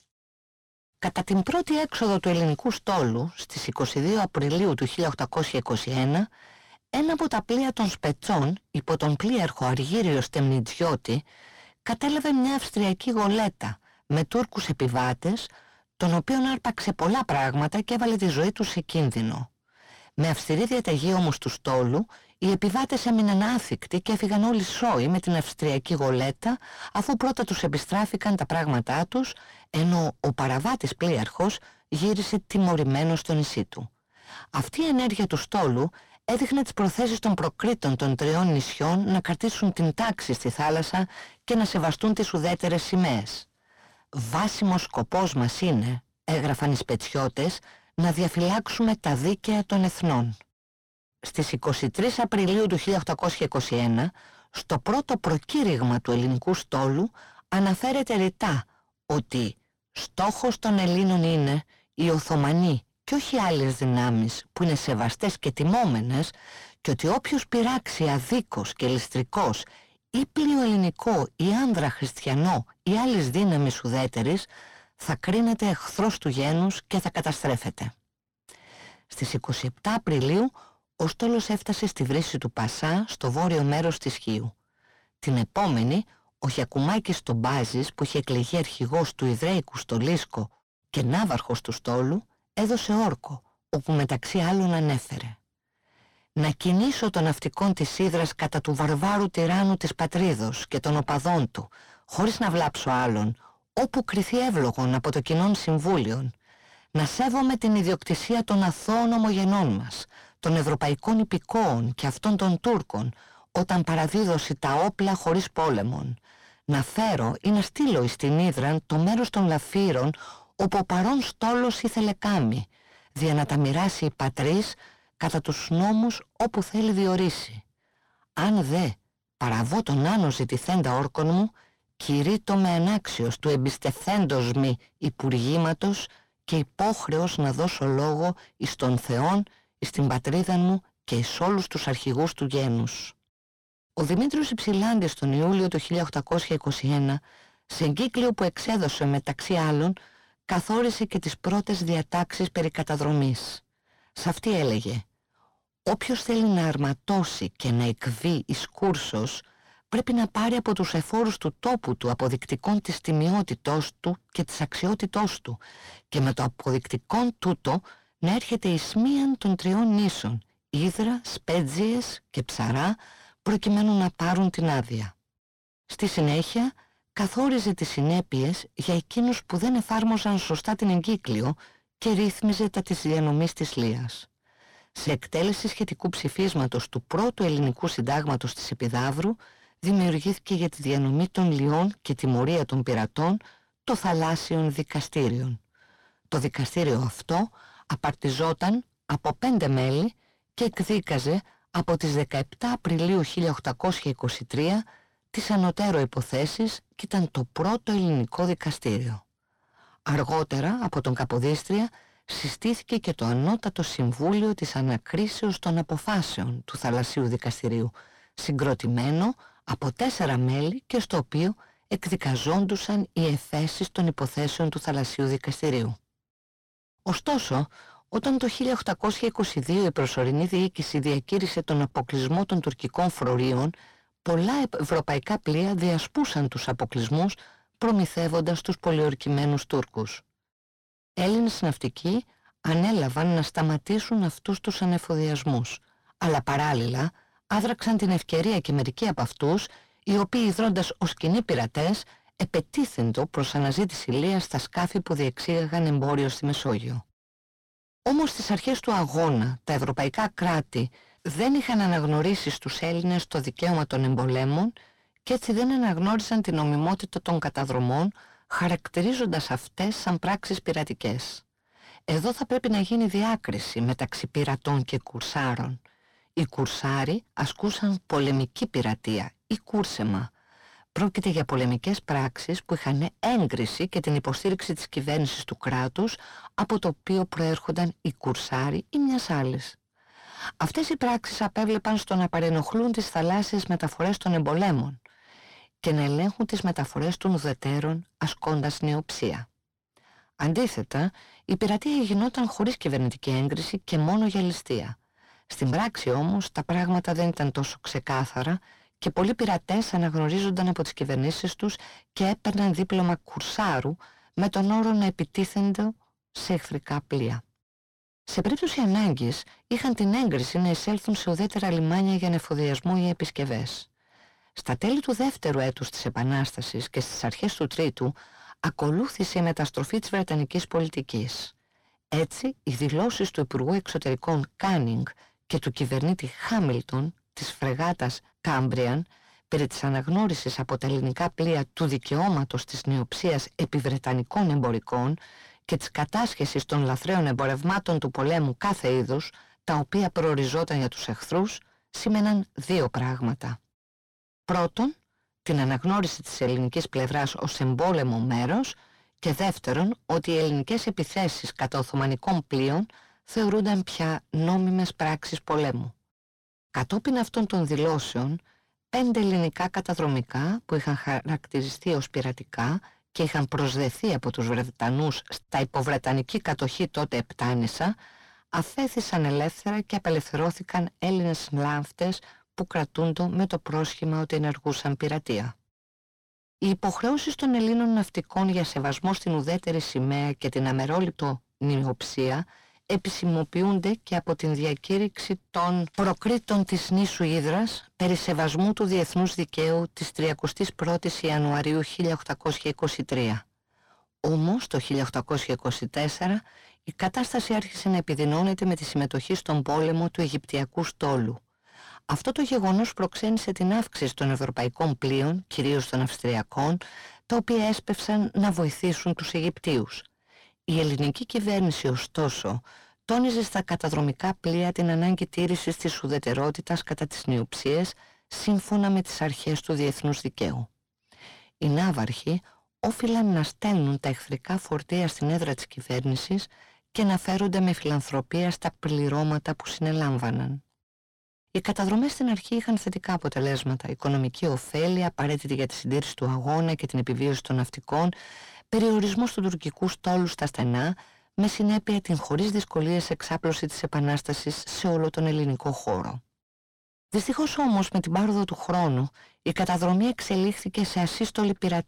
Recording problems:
distortion; heavy; 7 dB below the speech

